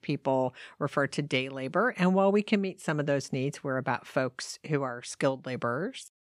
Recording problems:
none

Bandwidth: 14.5 kHz